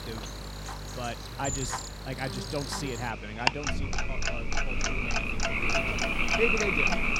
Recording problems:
animal sounds; very loud; throughout; 5 dB above the speech
household noises; very loud; throughout; 3 dB above the speech
electrical hum; noticeable; throughout; 50 Hz, 15 dB below the speech

